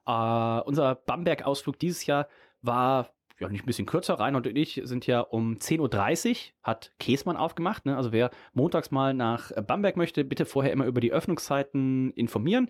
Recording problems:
none

